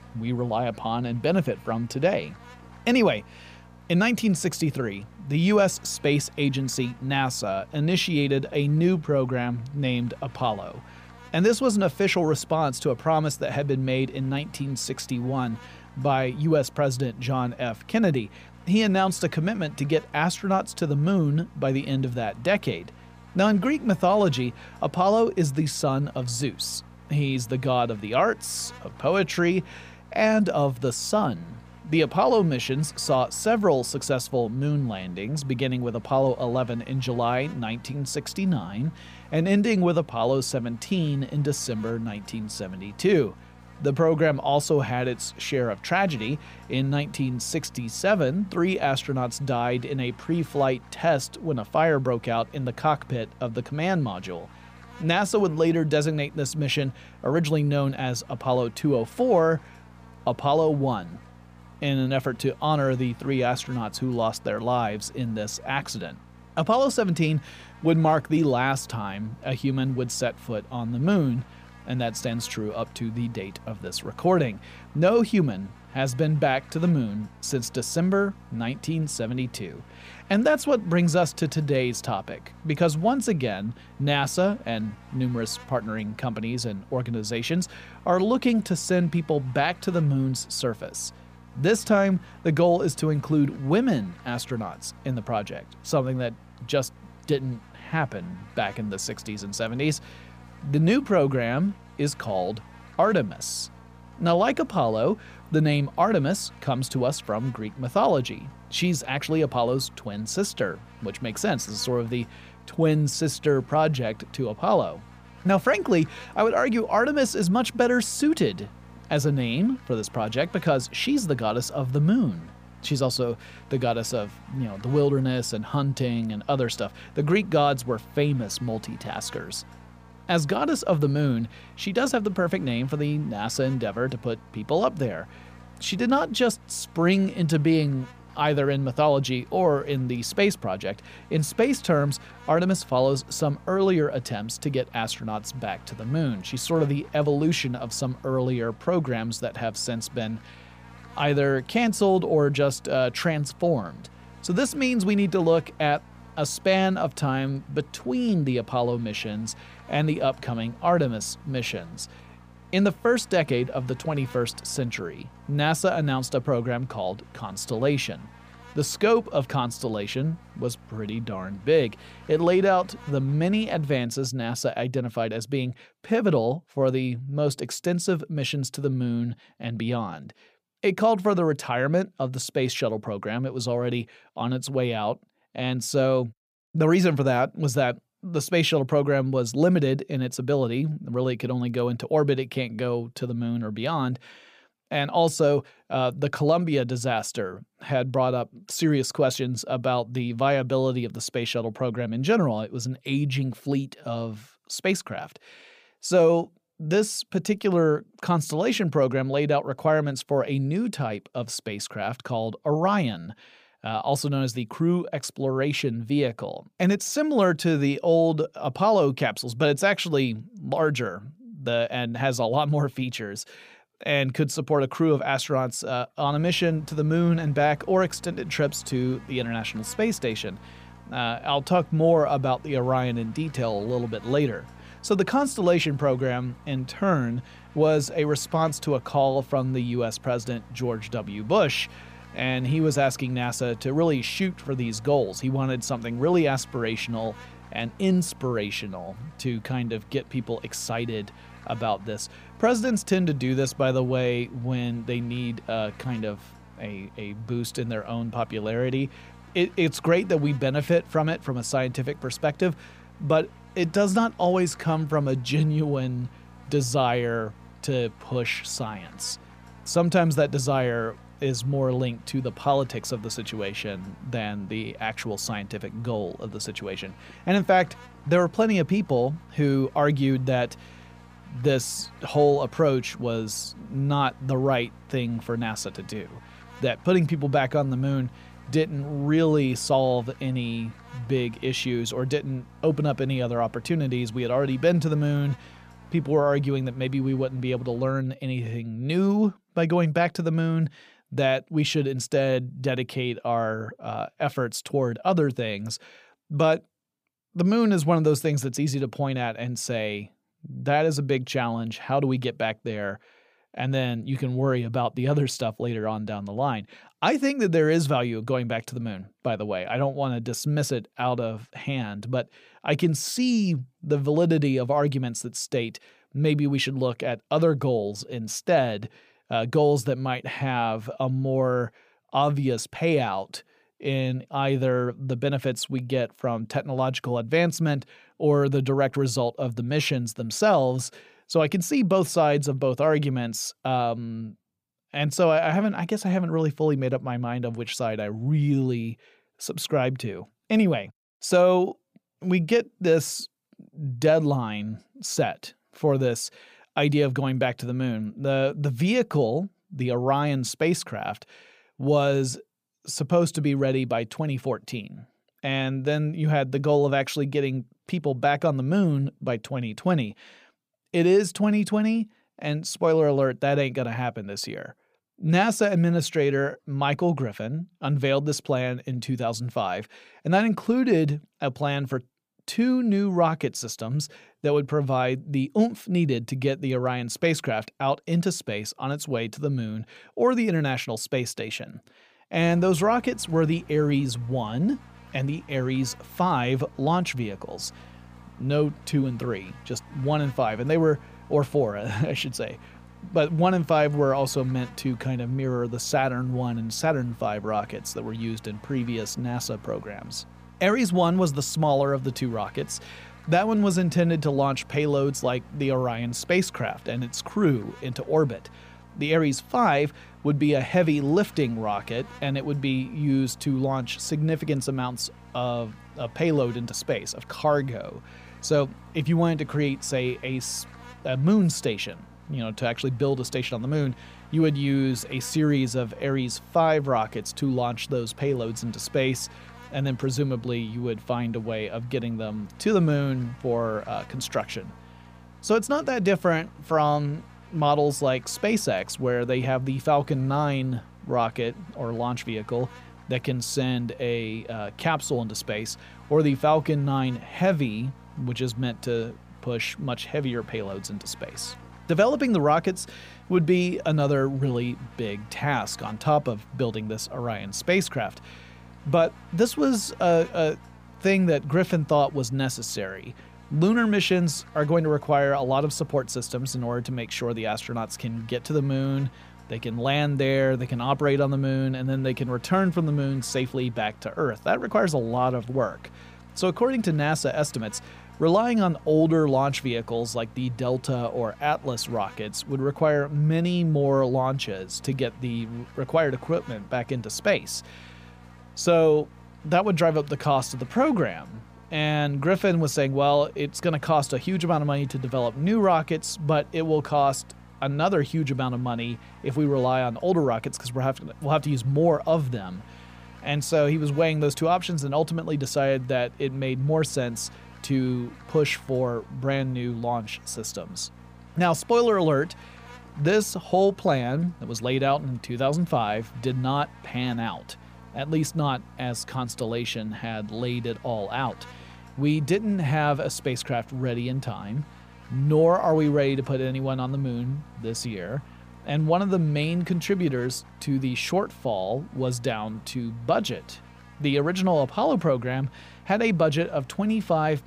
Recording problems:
electrical hum; faint; until 2:54, from 3:46 to 4:58 and from 6:33 on; 60 Hz, 25 dB below the speech

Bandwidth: 15 kHz